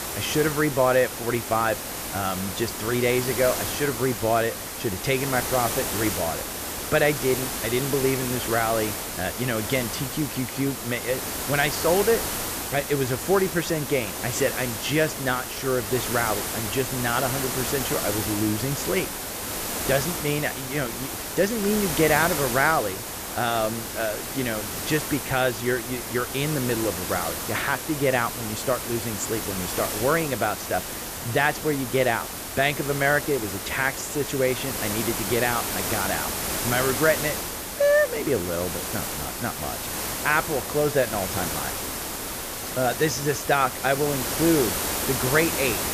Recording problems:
hiss; loud; throughout; 3 dB below the speech

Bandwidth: 14.5 kHz